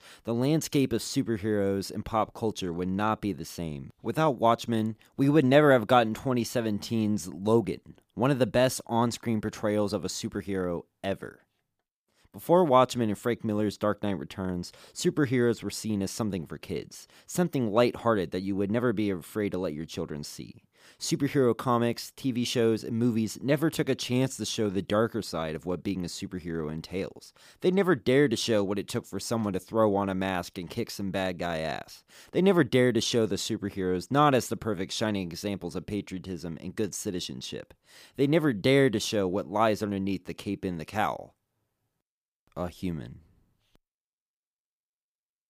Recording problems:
none

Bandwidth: 15 kHz